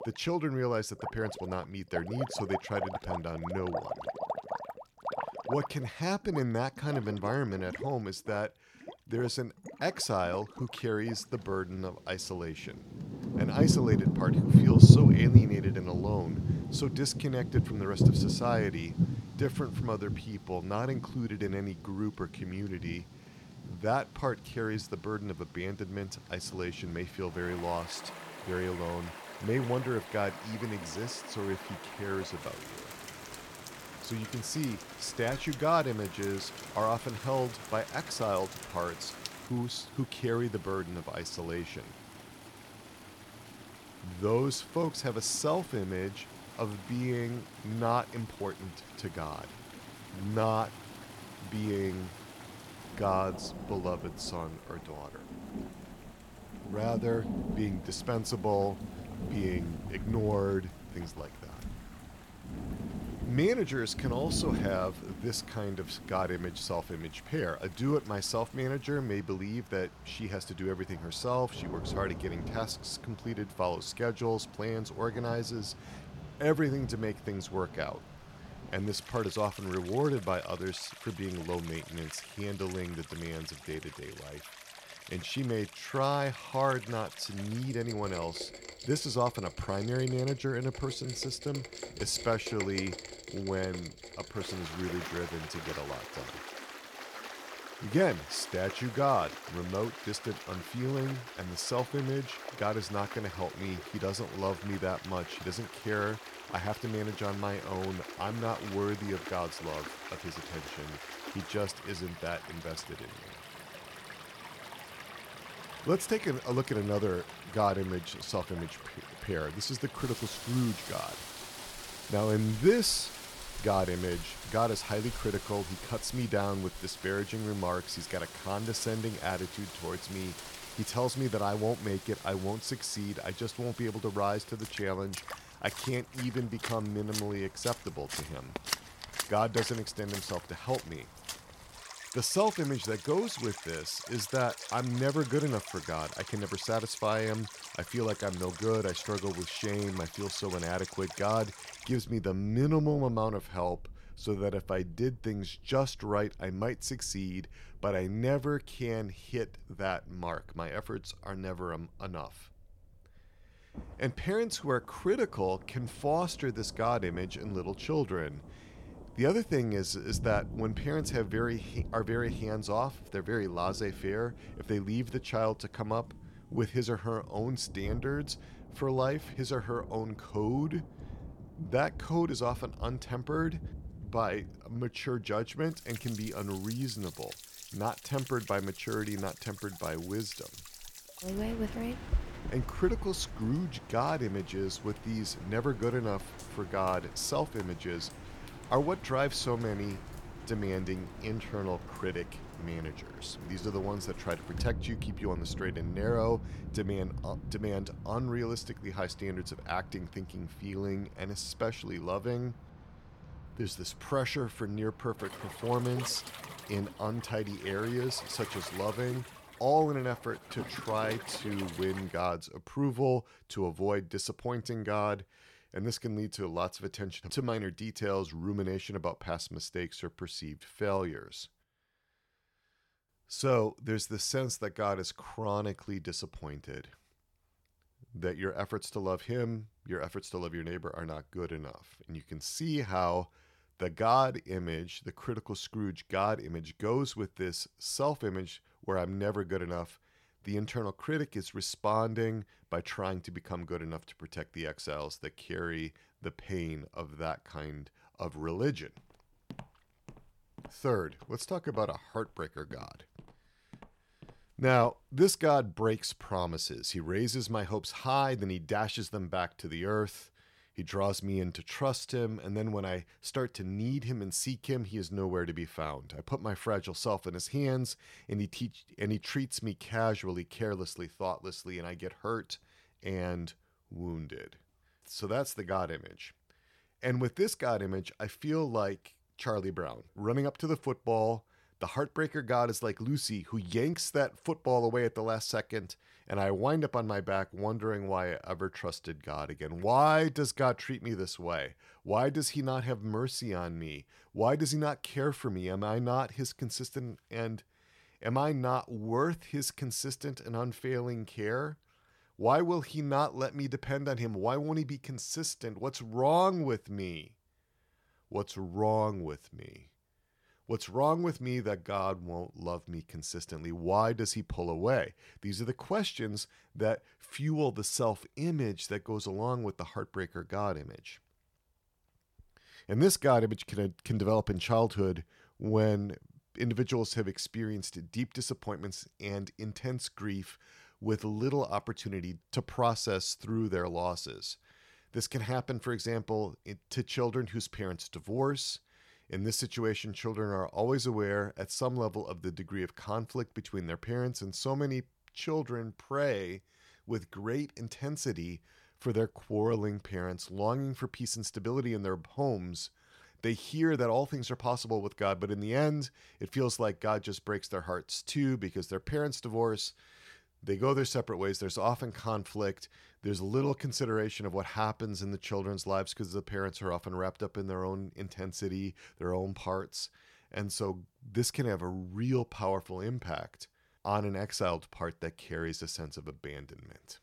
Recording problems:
rain or running water; loud; until 3:42; 3 dB below the speech
footsteps; faint; from 4:19 to 4:25; peak 15 dB below the speech

